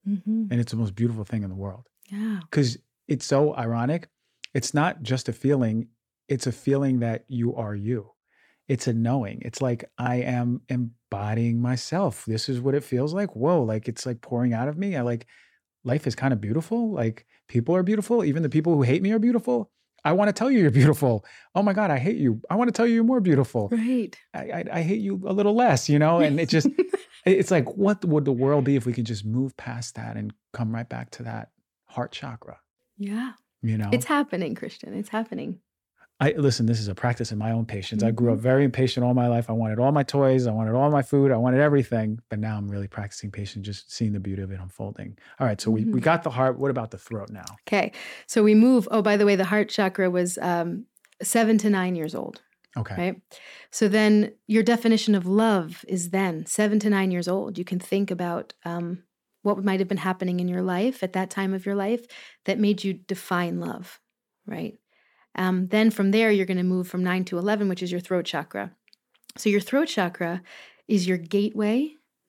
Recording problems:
none

